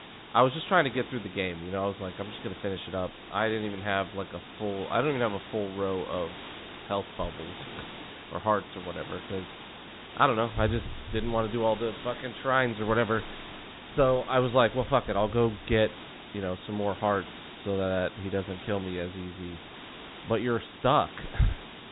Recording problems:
high frequencies cut off; severe; nothing above 4 kHz
hiss; noticeable; throughout; 15 dB below the speech

